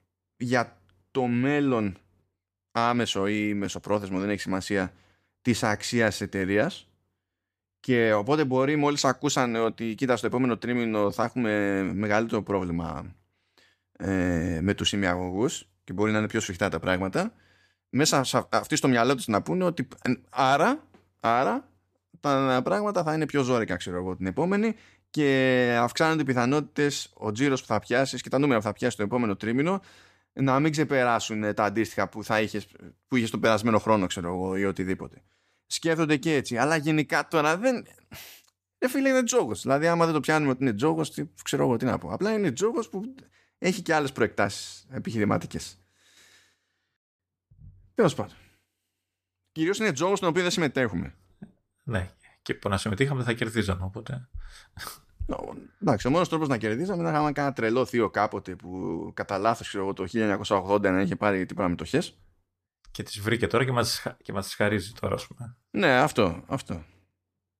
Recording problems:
none

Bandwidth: 14.5 kHz